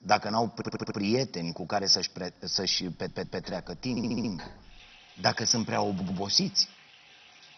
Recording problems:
garbled, watery; badly; nothing above 6 kHz
household noises; faint; from 3 s on; 25 dB below the speech
audio stuttering; 4 times, first at 0.5 s

